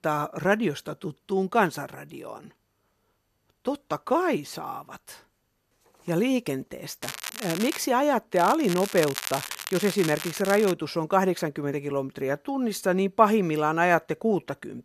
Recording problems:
crackling; loud; at 7 s and from 8.5 to 11 s; 9 dB below the speech

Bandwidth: 14 kHz